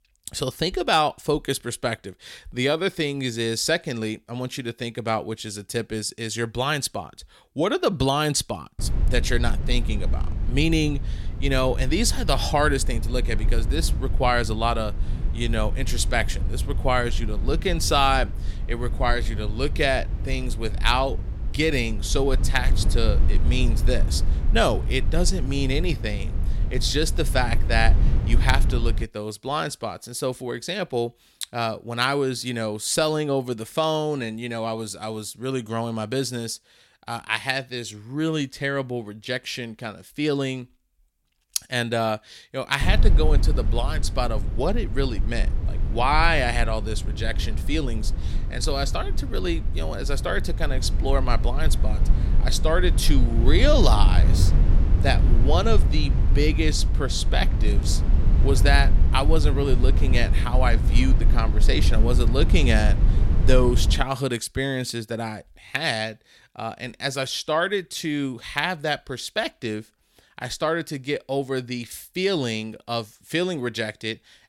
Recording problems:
low rumble; noticeable; from 9 to 29 s and from 43 s to 1:04; 15 dB below the speech

